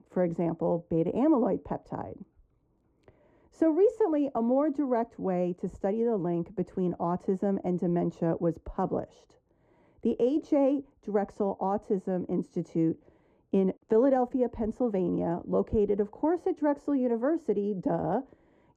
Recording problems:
muffled; very; fading above 1.5 kHz

